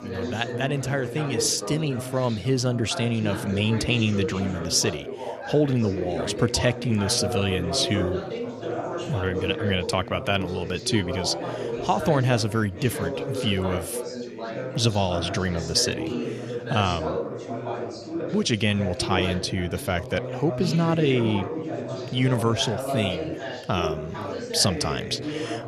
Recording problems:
background chatter; loud; throughout; 4 voices, 6 dB below the speech

